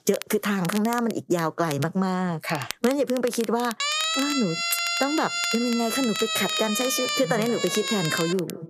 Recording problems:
echo of what is said; noticeable; from 6.5 s on; 180 ms later, 15 dB below the speech
squashed, flat; somewhat
crackle, like an old record; noticeable; 15 dB below the speech
siren; loud; from 4 s on; peak 3 dB above the speech

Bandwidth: 14.5 kHz